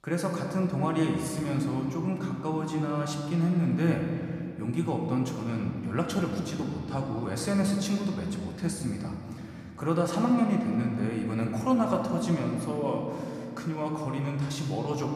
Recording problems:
room echo; noticeable; dies away in 2.5 s
off-mic speech; somewhat distant

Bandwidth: 14.5 kHz